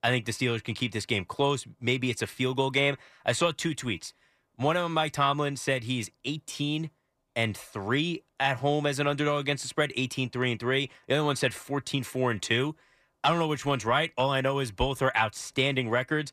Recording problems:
none

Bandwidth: 14.5 kHz